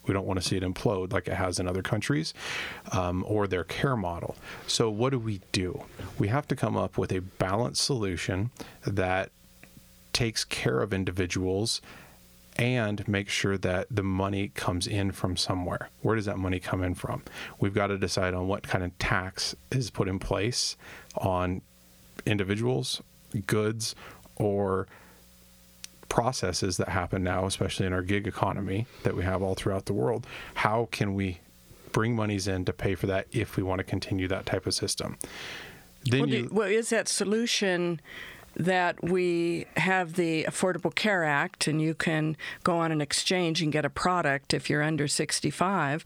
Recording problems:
squashed, flat; heavily

